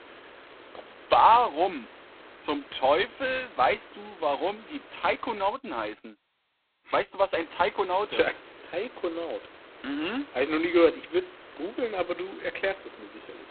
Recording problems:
phone-call audio; poor line; nothing above 4 kHz
hiss; faint; until 5.5 s and from 7.5 s on; 20 dB below the speech

